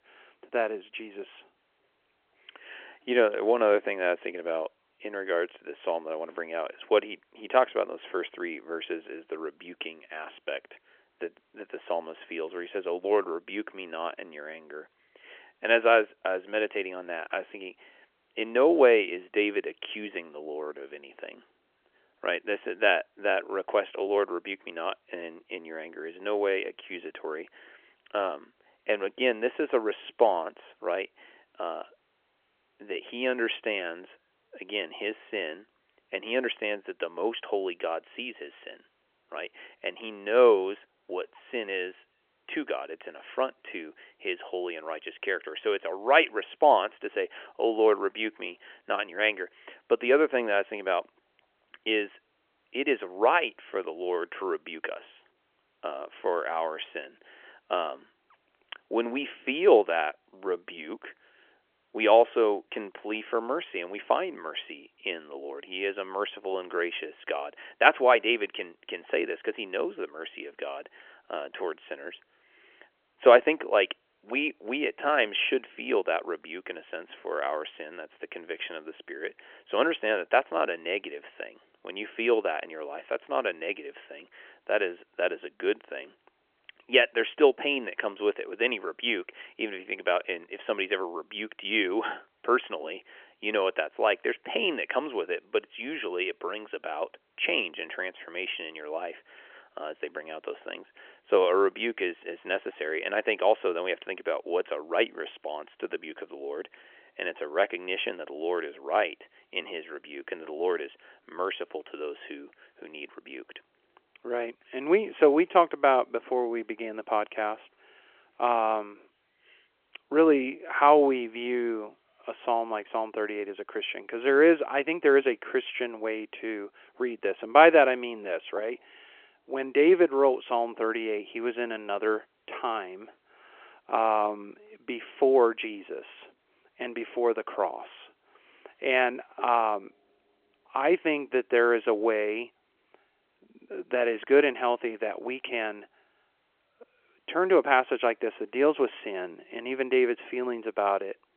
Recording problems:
phone-call audio; nothing above 3.5 kHz

